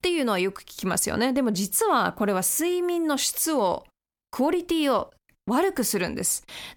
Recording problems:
none

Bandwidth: 18.5 kHz